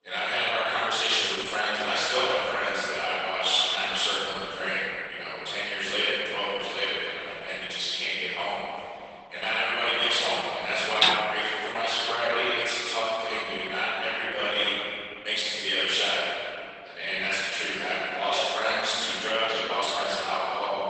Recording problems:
room echo; strong; dies away in 2.7 s
off-mic speech; far
garbled, watery; badly; nothing above 8 kHz
thin; very; fading below 550 Hz
clattering dishes; loud; at 11 s; peak 4 dB above the speech

